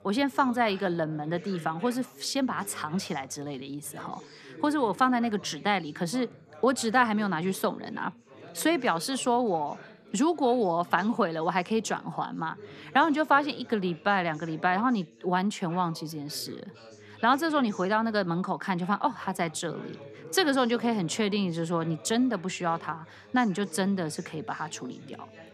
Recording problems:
background chatter; noticeable; throughout; 3 voices, 20 dB below the speech

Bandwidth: 14 kHz